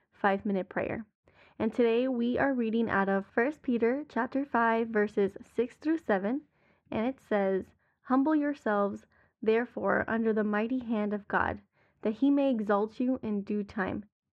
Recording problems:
muffled; very; fading above 1.5 kHz

